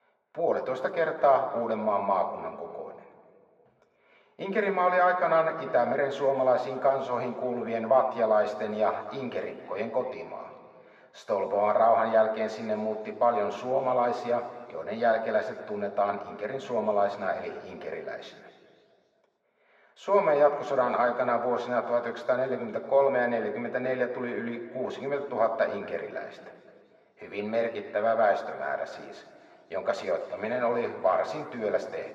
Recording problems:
muffled; very; fading above 3 kHz
thin; somewhat; fading below 450 Hz
room echo; slight; dies away in 2.1 s
off-mic speech; somewhat distant

